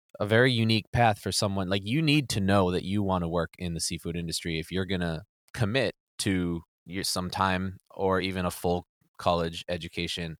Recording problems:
none

